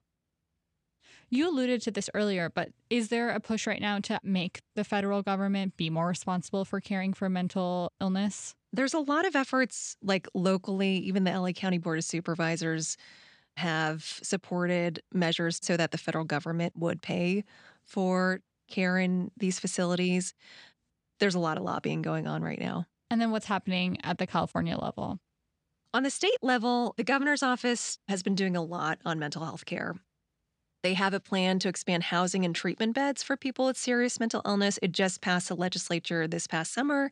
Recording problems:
none

